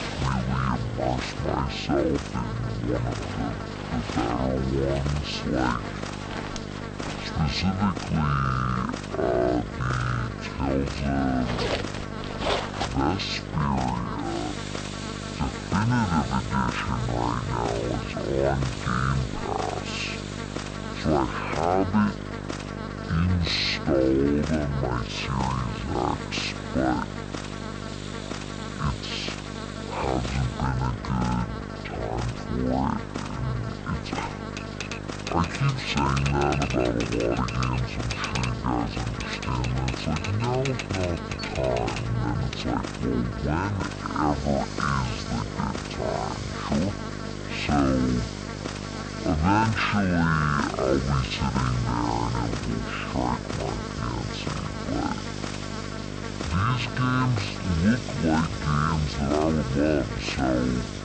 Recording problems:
wrong speed and pitch; too slow and too low; 0.5 times normal speed
electrical hum; loud; throughout; 50 Hz, 7 dB below the speech
household noises; noticeable; throughout; 10 dB below the speech
chatter from many people; faint; throughout; 20 dB below the speech

